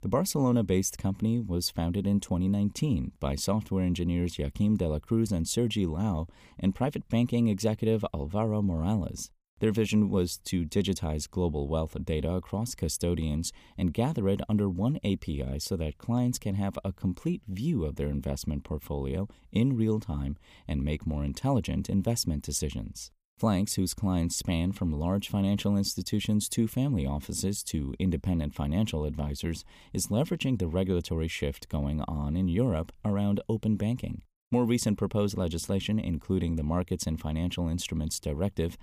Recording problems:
none

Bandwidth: 15 kHz